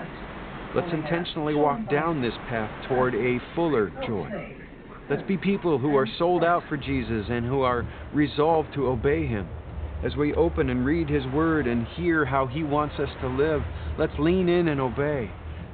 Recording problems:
high frequencies cut off; severe; nothing above 4 kHz
train or aircraft noise; noticeable; throughout; 10 dB below the speech

